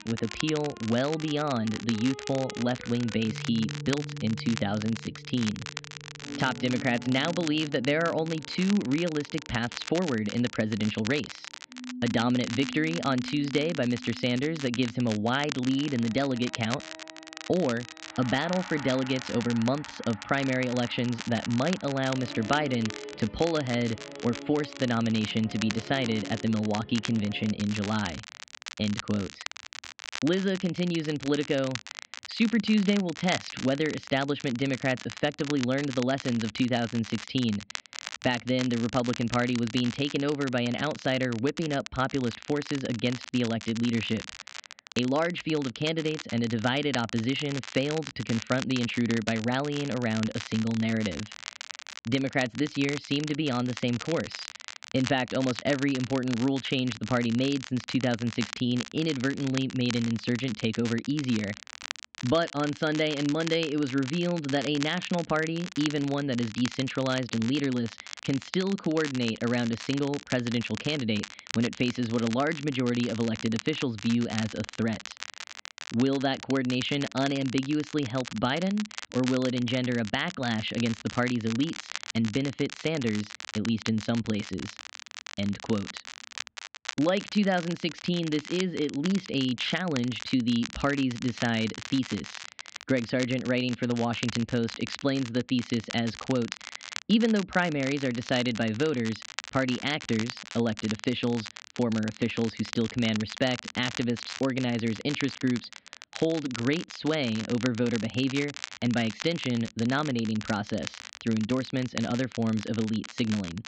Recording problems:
muffled; very slightly; fading above 3.5 kHz
high frequencies cut off; slight; nothing above 8 kHz
background music; noticeable; until 28 s; 15 dB below the speech
crackle, like an old record; noticeable; 10 dB below the speech

